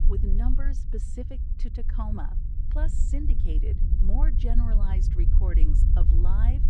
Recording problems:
low rumble; loud; throughout; 4 dB below the speech

